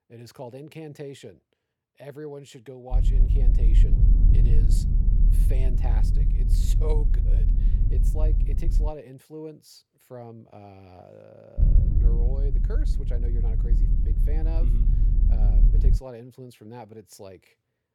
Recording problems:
low rumble; loud; from 3 to 9 s and from 12 to 16 s; 1 dB below the speech

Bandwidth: 18.5 kHz